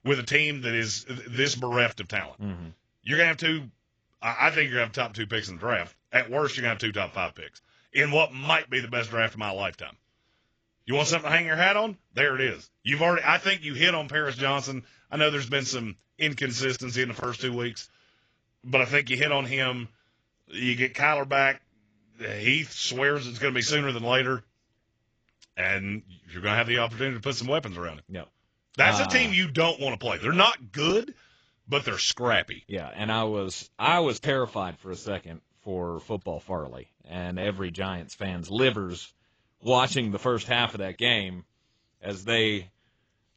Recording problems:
garbled, watery; badly; nothing above 7.5 kHz

